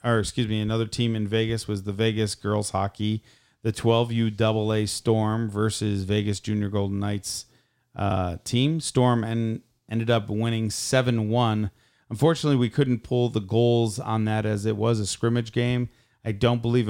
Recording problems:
abrupt cut into speech; at the end

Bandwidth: 16 kHz